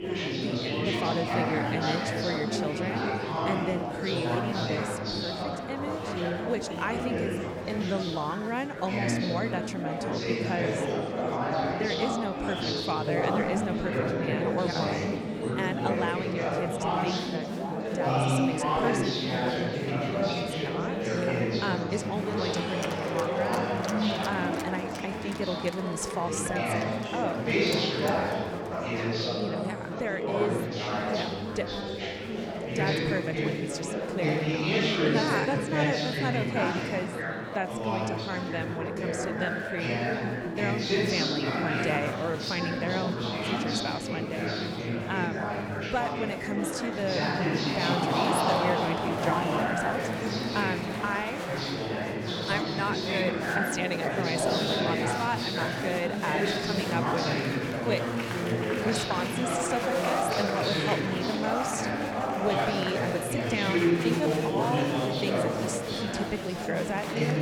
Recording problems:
murmuring crowd; very loud; throughout; 4 dB above the speech
alarm; faint; at 28 s; peak 10 dB below the speech

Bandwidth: 18.5 kHz